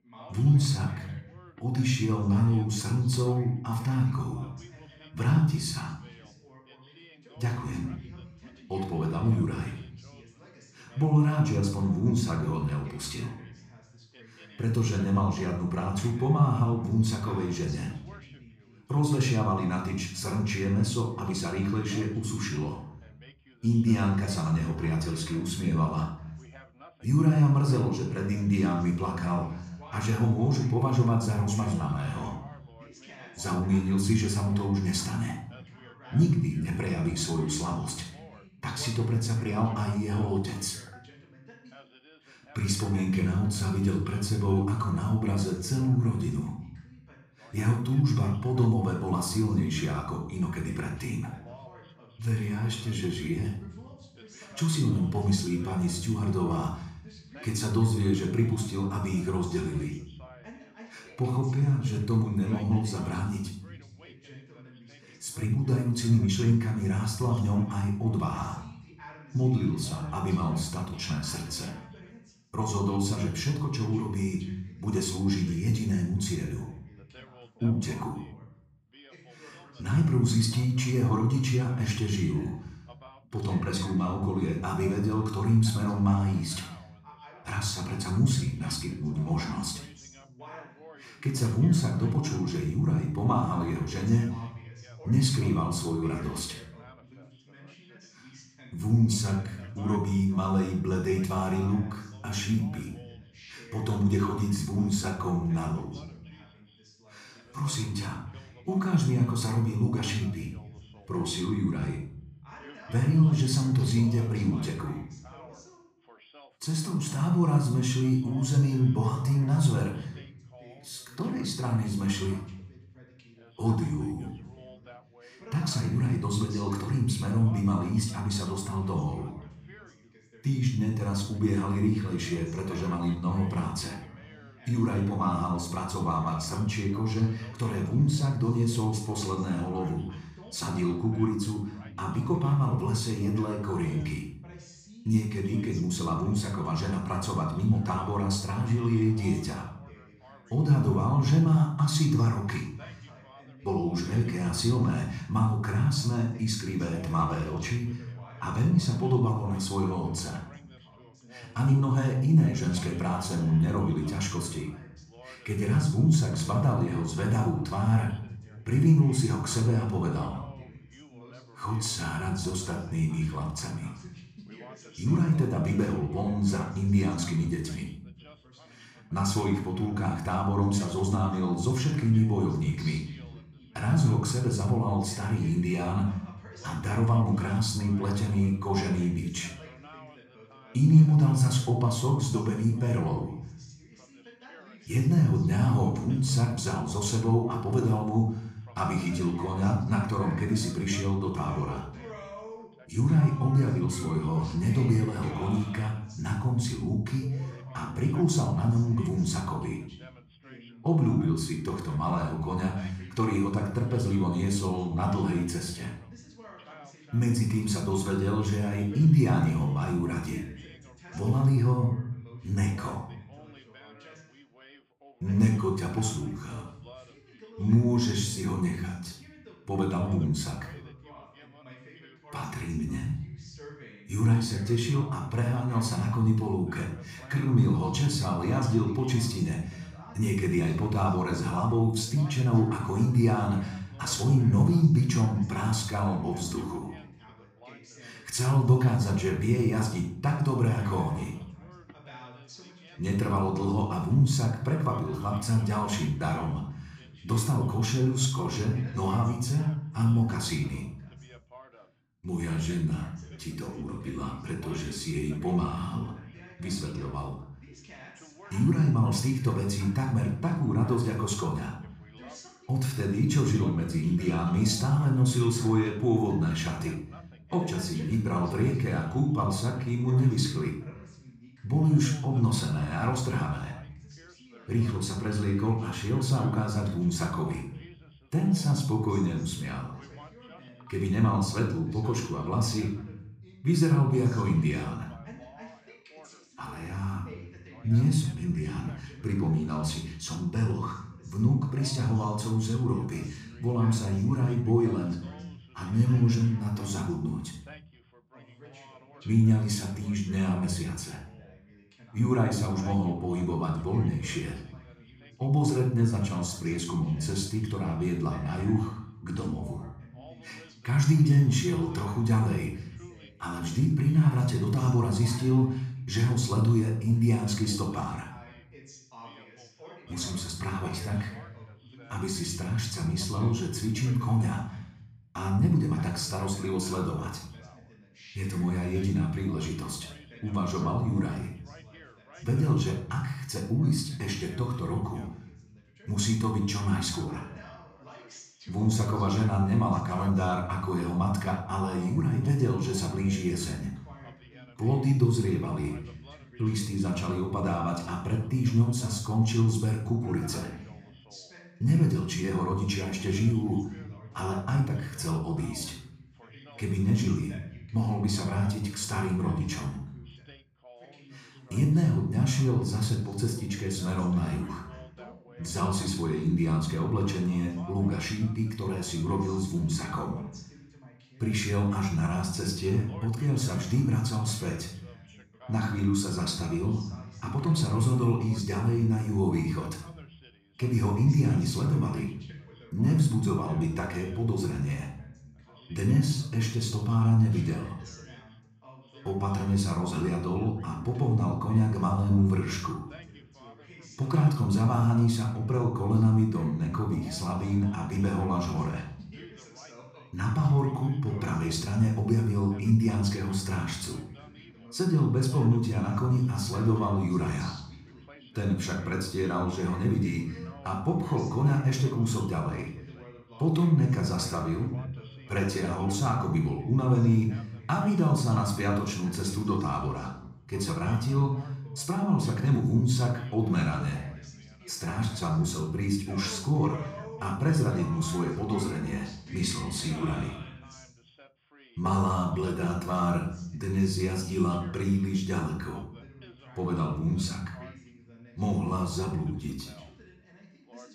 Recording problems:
off-mic speech; far
room echo; noticeable; dies away in 0.7 s
background chatter; faint; throughout; 2 voices, 25 dB below the speech

